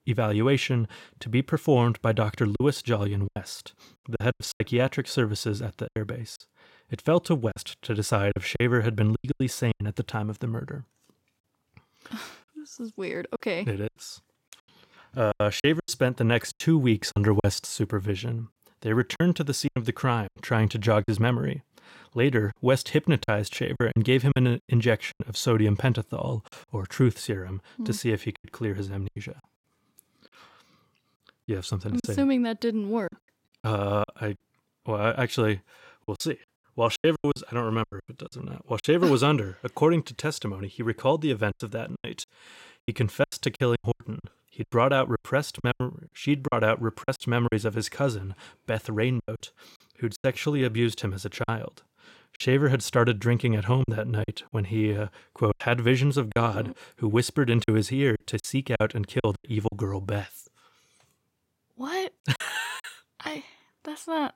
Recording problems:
choppy; very; 9% of the speech affected

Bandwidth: 16 kHz